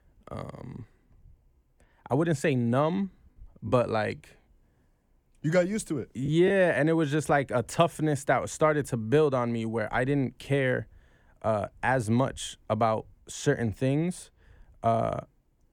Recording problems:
choppy; occasionally; at 3.5 s; 5% of the speech affected

